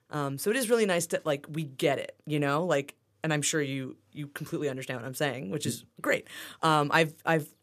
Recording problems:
none

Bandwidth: 14.5 kHz